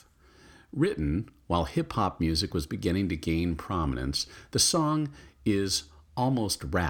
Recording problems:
abrupt cut into speech; at the end

